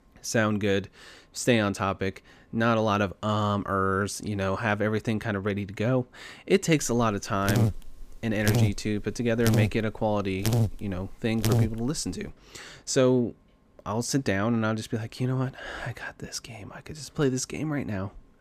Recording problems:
electrical hum; loud; from 7 to 12 s; 50 Hz, 5 dB below the speech

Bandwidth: 15 kHz